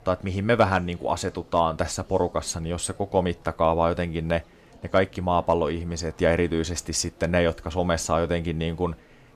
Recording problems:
chatter from many people; faint; throughout; 25 dB below the speech

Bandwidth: 14.5 kHz